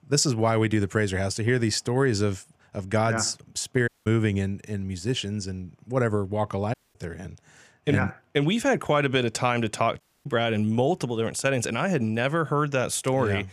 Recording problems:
audio cutting out; at 4 s, at 6.5 s and at 10 s

